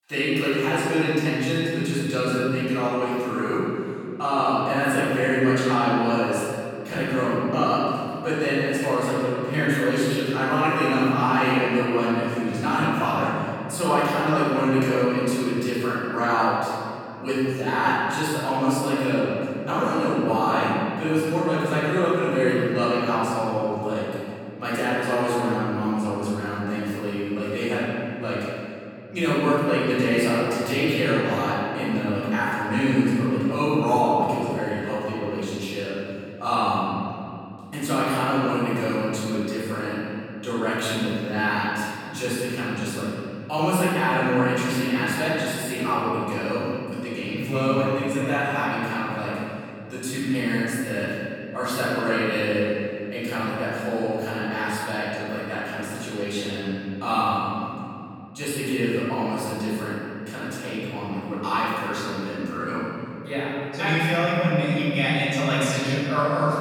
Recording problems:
room echo; strong; dies away in 3 s
off-mic speech; far

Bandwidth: 18 kHz